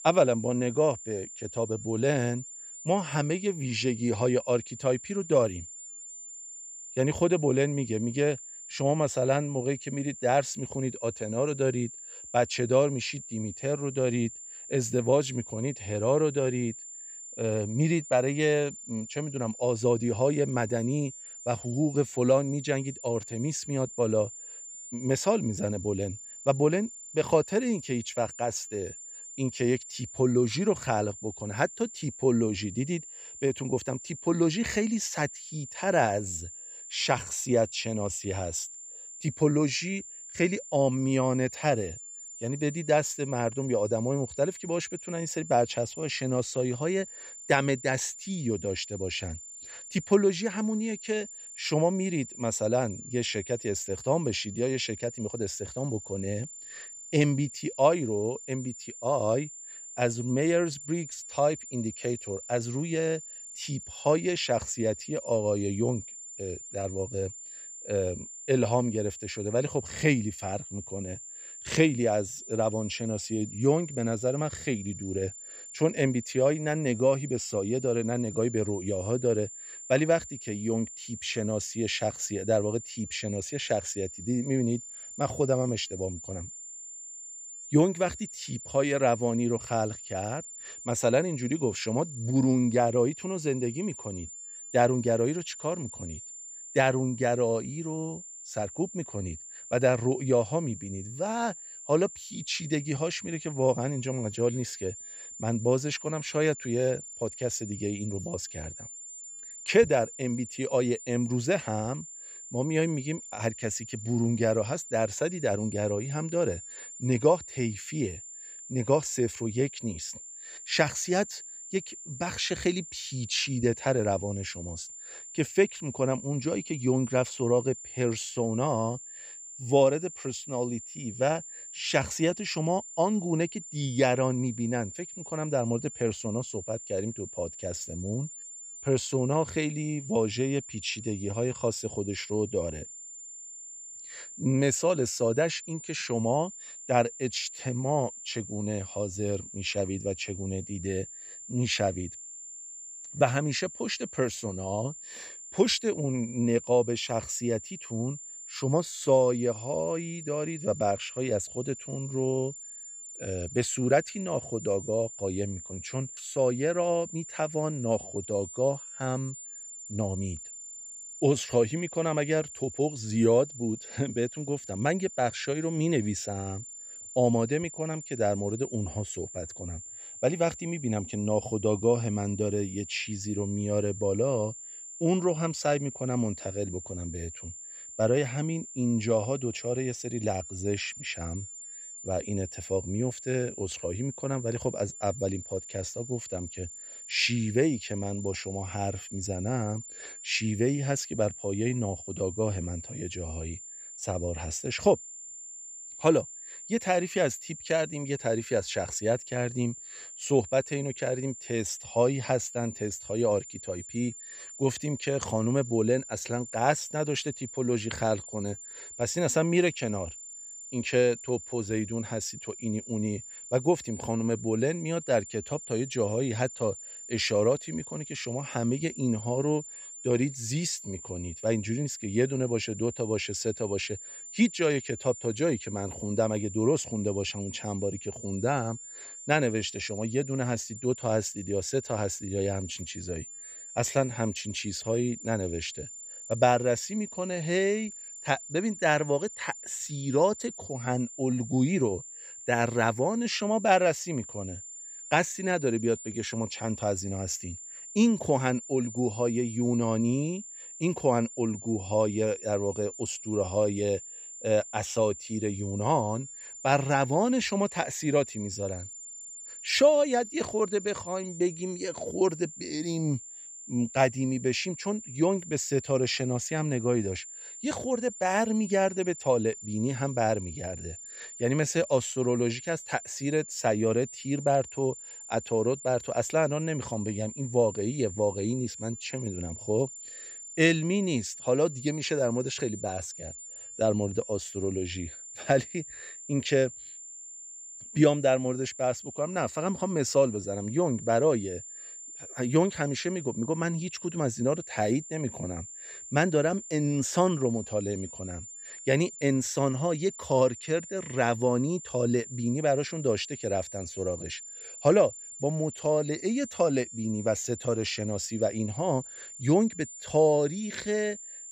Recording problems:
high-pitched whine; noticeable; throughout; 7 kHz, 10 dB below the speech

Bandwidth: 15 kHz